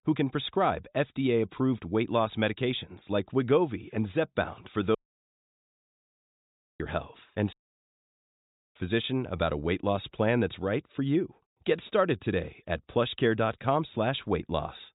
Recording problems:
high frequencies cut off; severe; nothing above 4 kHz
audio cutting out; at 5 s for 2 s and at 7.5 s for 1 s

